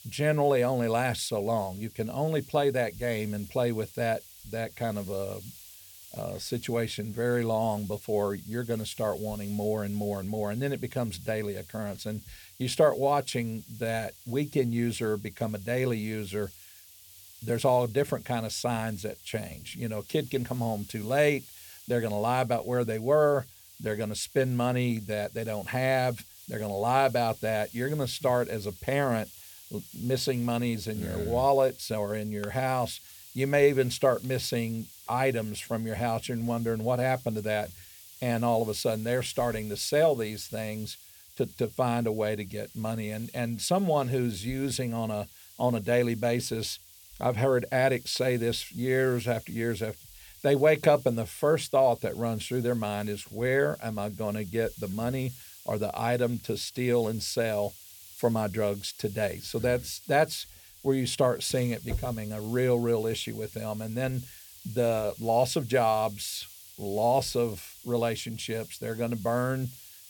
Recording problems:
hiss; noticeable; throughout; 20 dB below the speech

